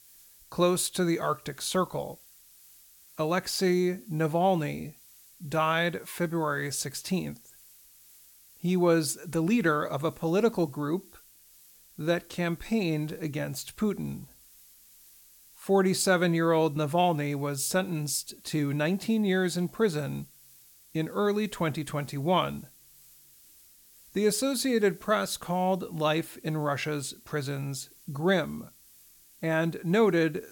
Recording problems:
hiss; faint; throughout; 25 dB below the speech

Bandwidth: 17 kHz